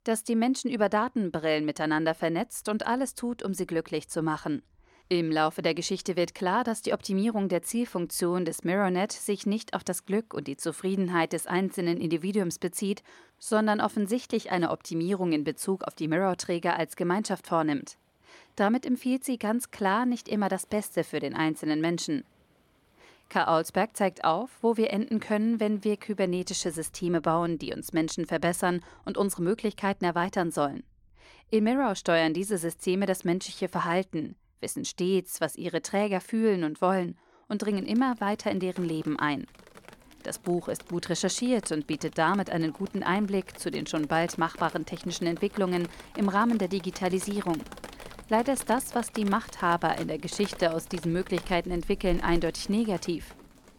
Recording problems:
rain or running water; noticeable; throughout; 20 dB below the speech

